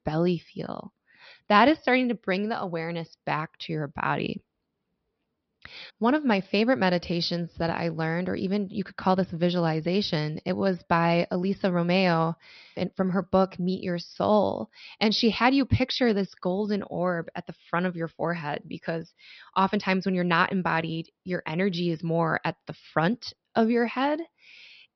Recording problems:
high frequencies cut off; noticeable; nothing above 5.5 kHz

